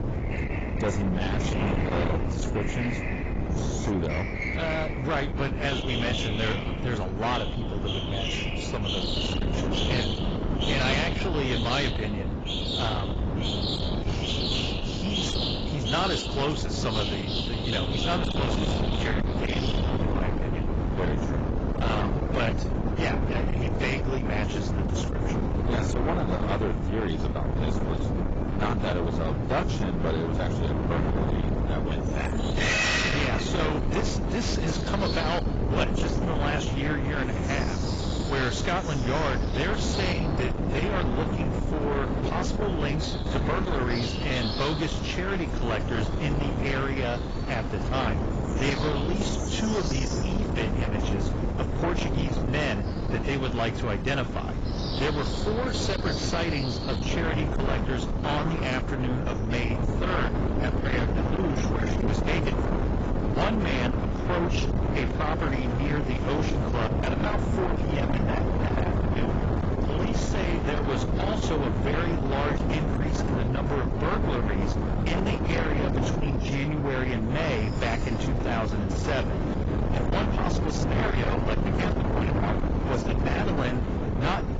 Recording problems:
distortion; heavy; 6 dB below the speech
garbled, watery; badly; nothing above 7.5 kHz
wind noise on the microphone; heavy; 3 dB below the speech
animal sounds; loud; throughout; 5 dB below the speech

